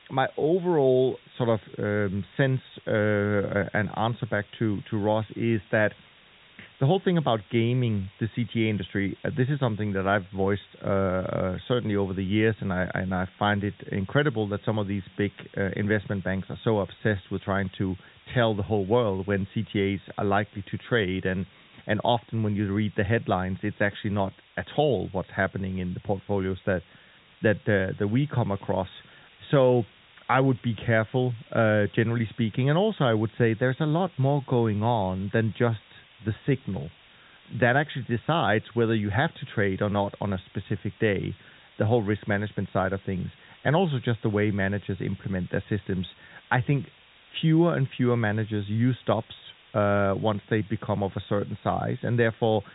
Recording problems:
high frequencies cut off; severe; nothing above 4 kHz
hiss; faint; throughout; 25 dB below the speech

